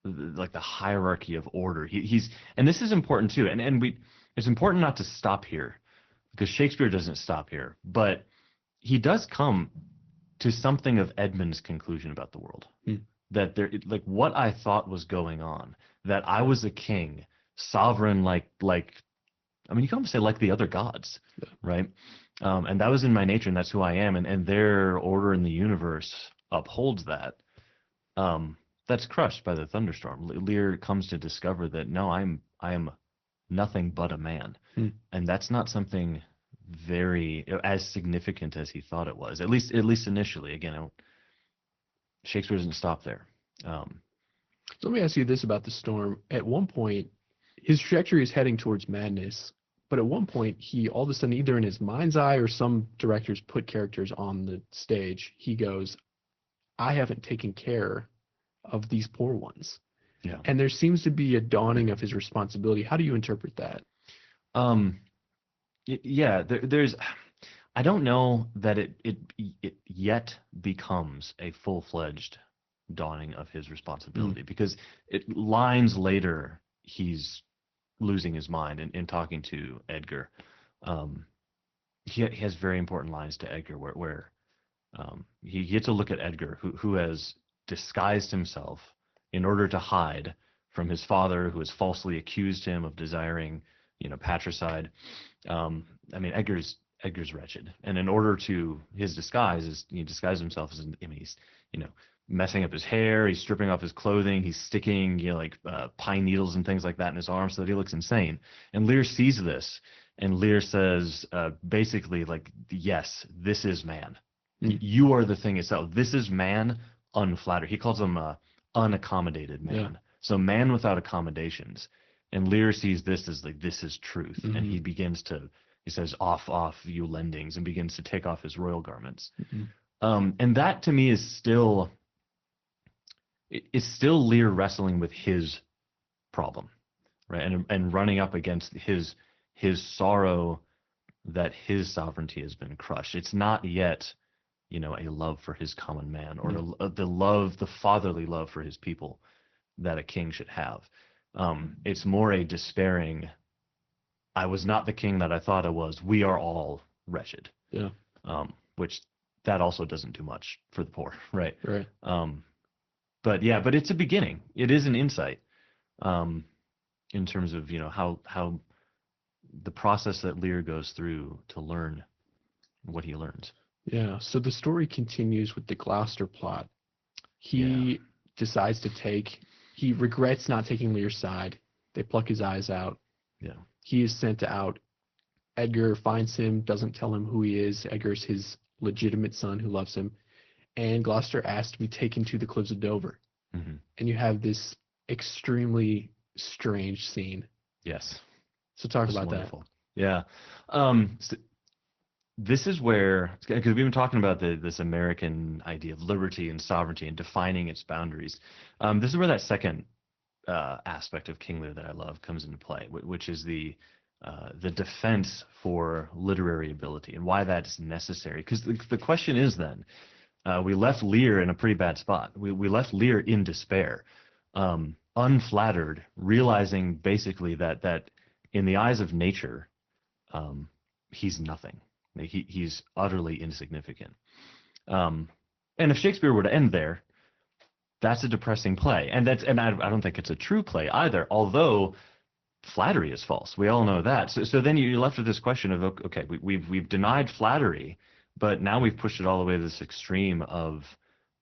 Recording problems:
high frequencies cut off; noticeable; nothing above 6 kHz
garbled, watery; slightly

